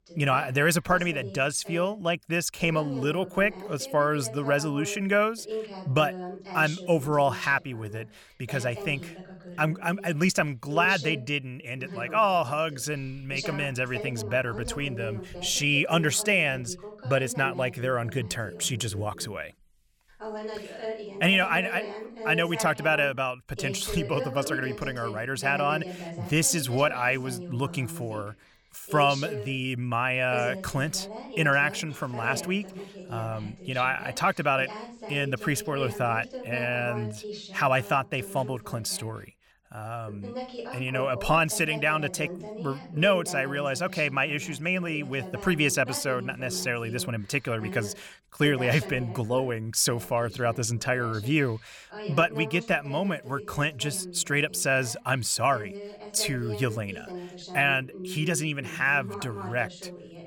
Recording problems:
voice in the background; noticeable; throughout; 15 dB below the speech

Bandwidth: 18.5 kHz